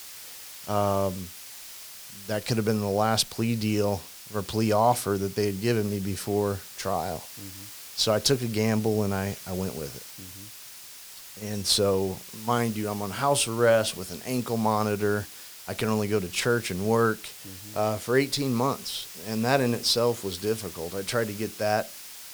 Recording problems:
hiss; noticeable; throughout; 15 dB below the speech

